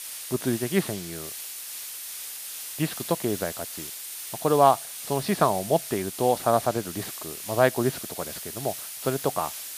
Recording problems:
muffled; slightly; fading above 4 kHz
hiss; loud; throughout; 8 dB below the speech

